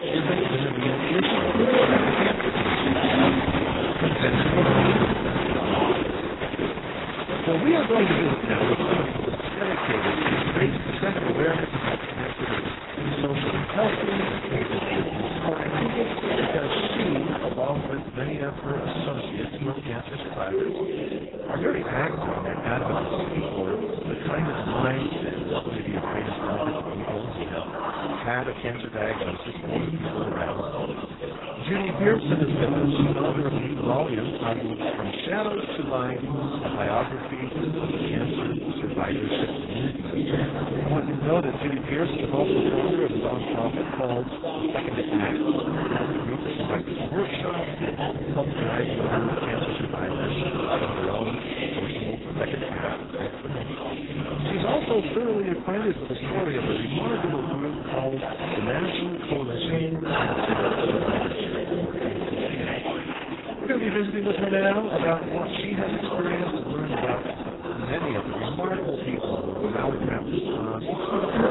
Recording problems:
garbled, watery; badly; nothing above 4 kHz
chatter from many people; very loud; throughout; 1 dB above the speech

